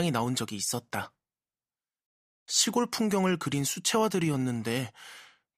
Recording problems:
abrupt cut into speech; at the start

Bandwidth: 15 kHz